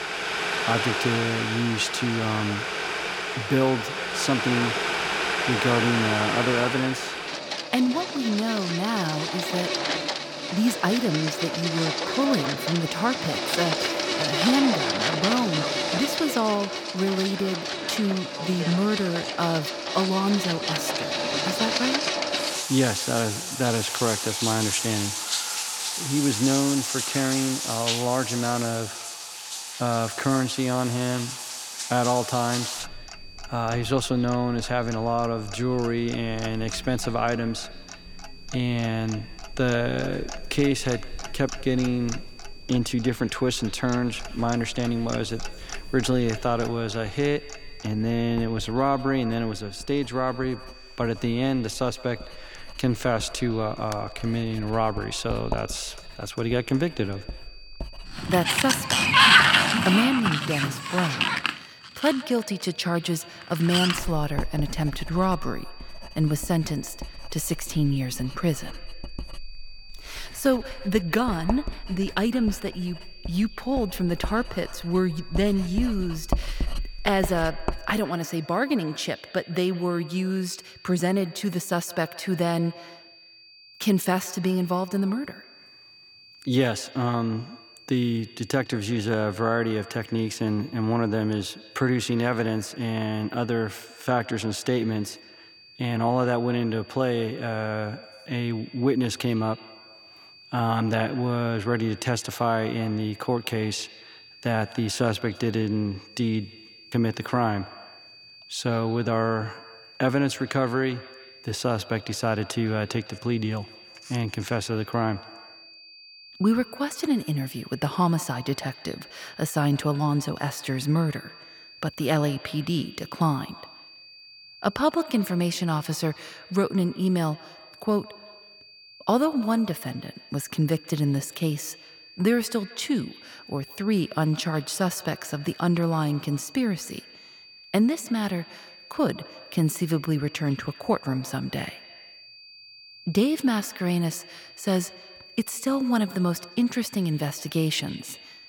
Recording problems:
echo of what is said; faint; throughout; 160 ms later, 20 dB below the speech
household noises; very loud; until 1:18; as loud as the speech
high-pitched whine; noticeable; throughout; 4.5 kHz, 20 dB below the speech

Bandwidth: 18 kHz